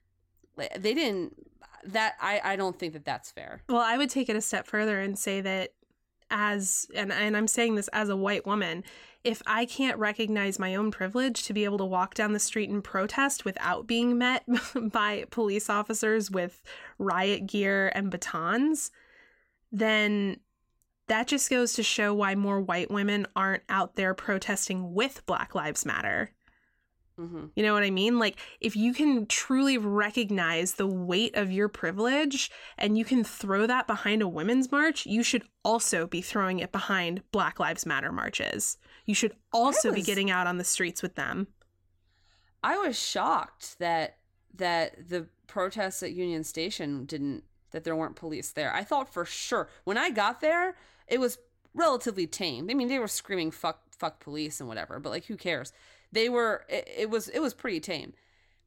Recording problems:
none

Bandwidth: 16.5 kHz